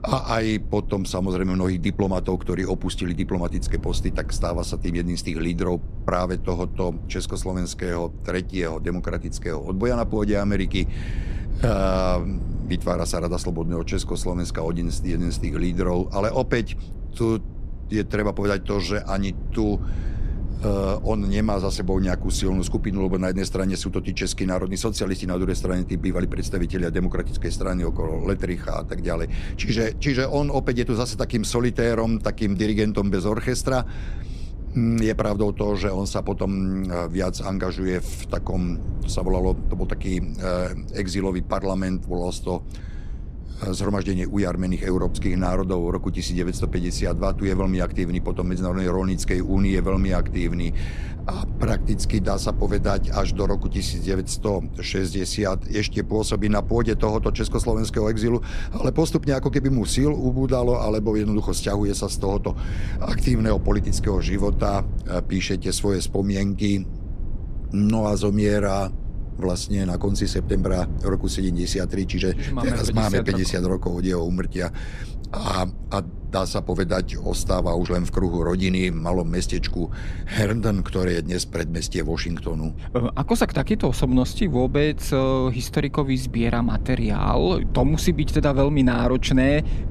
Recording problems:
low rumble; noticeable; throughout; 20 dB below the speech

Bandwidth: 14 kHz